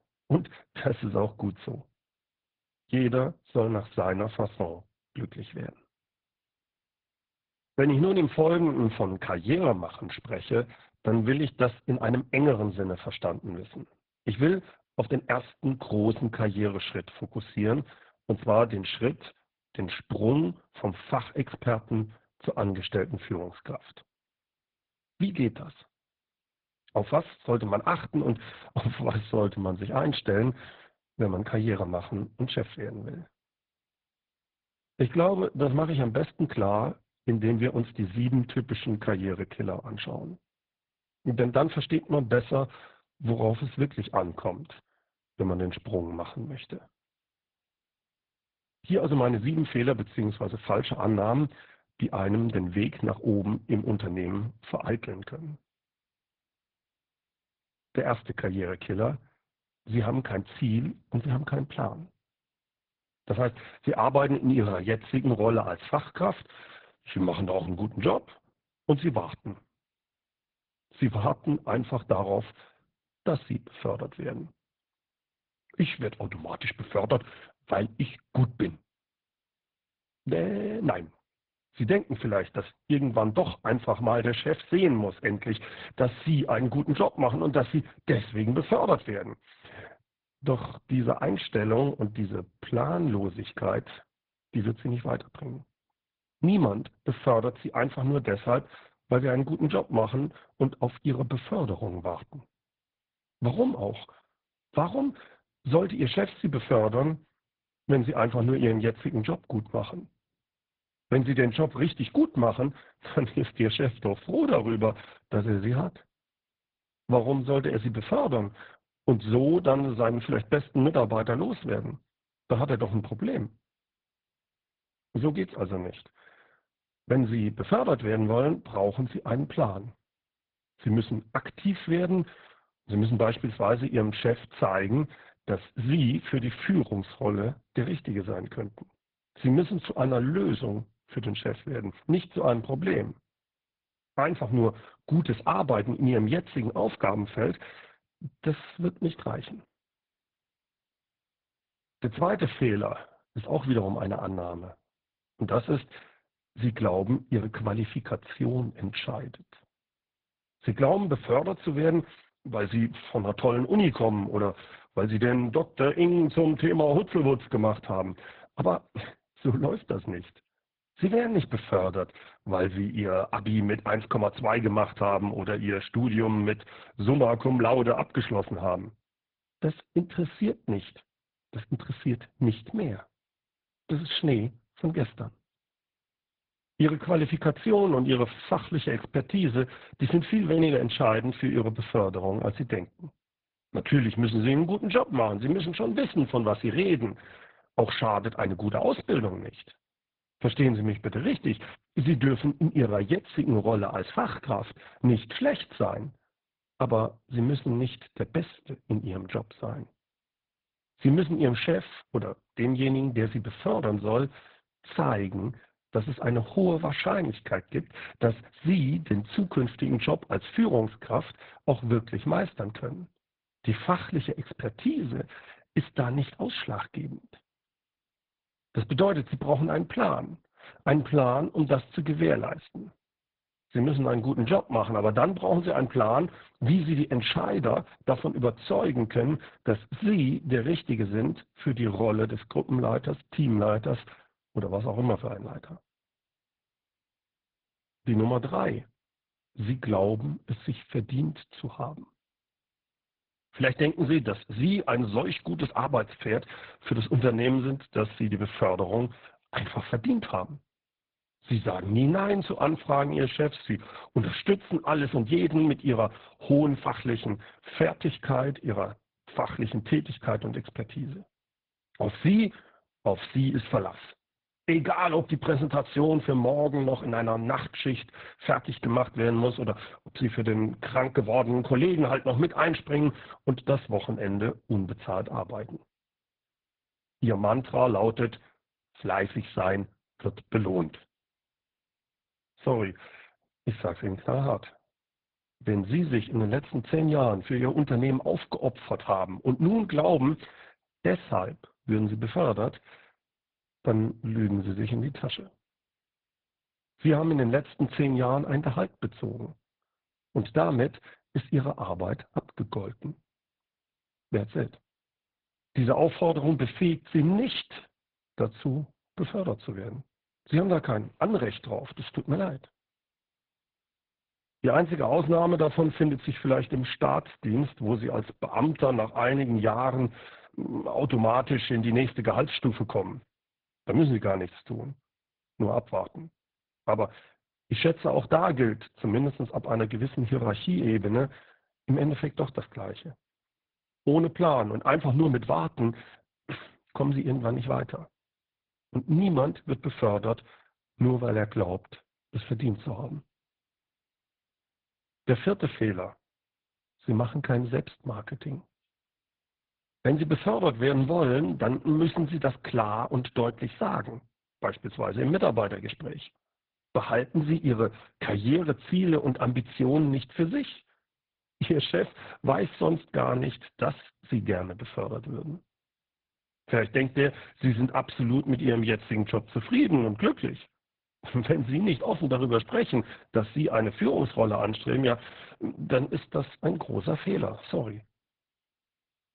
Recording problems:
garbled, watery; badly

